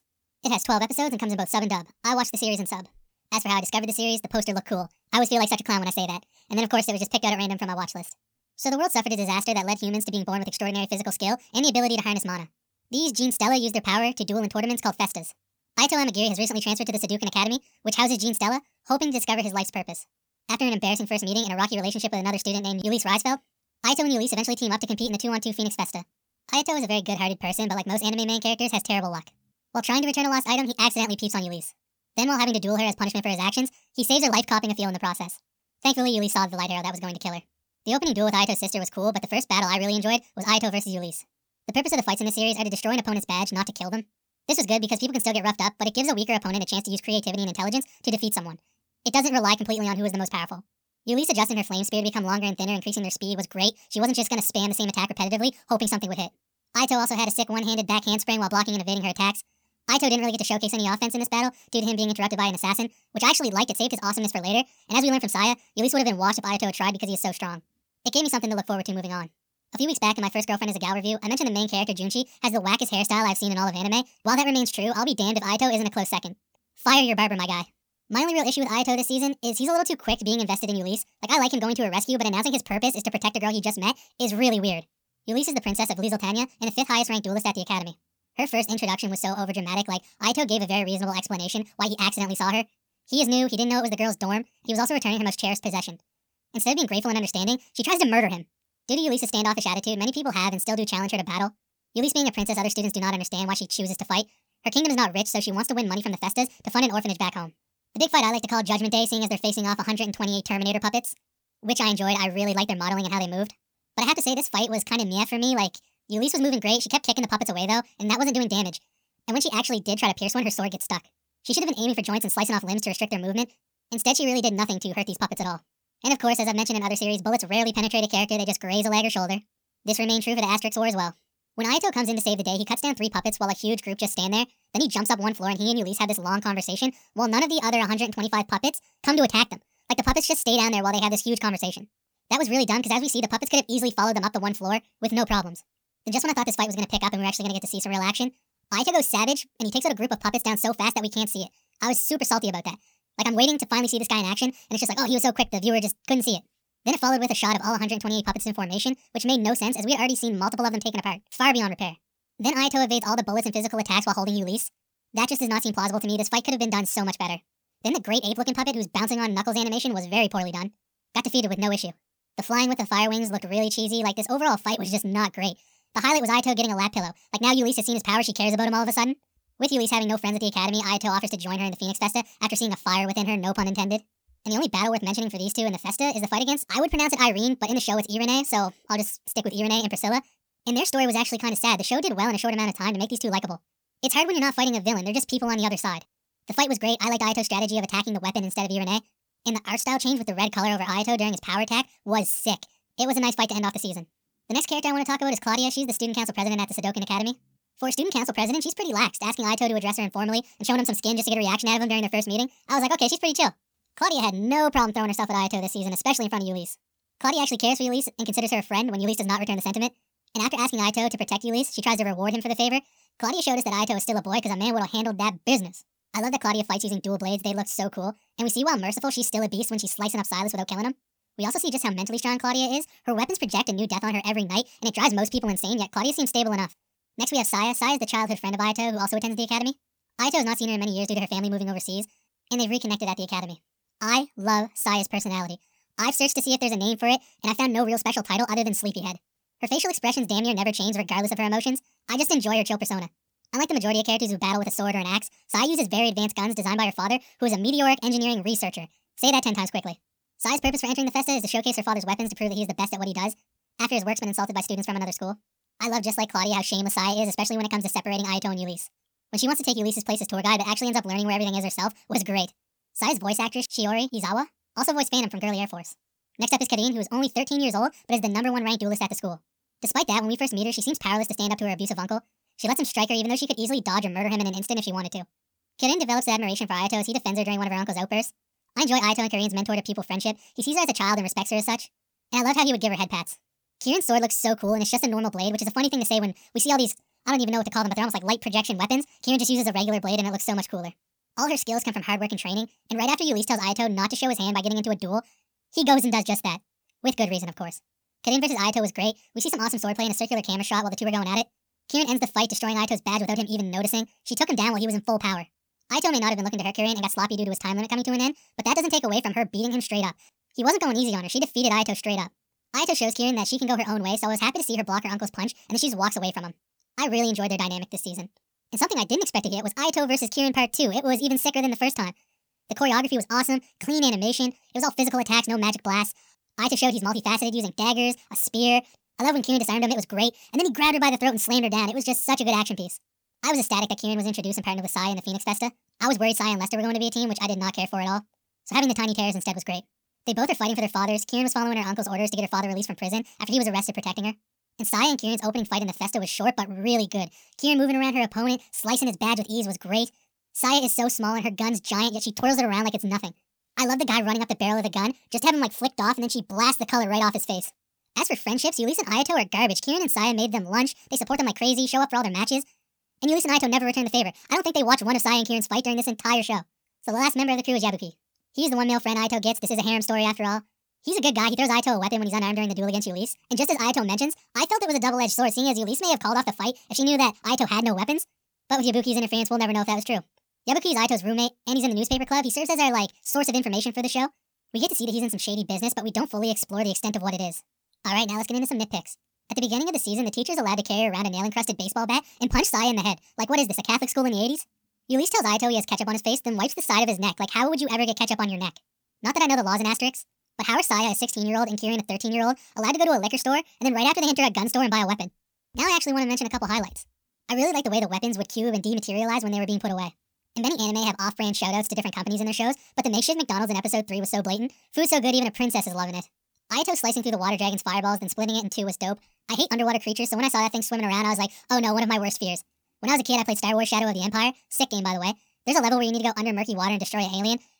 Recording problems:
wrong speed and pitch; too fast and too high; 1.6 times normal speed

